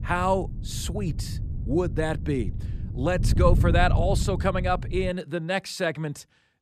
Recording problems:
wind noise on the microphone; occasional gusts; until 5 s; 15 dB below the speech

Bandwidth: 14.5 kHz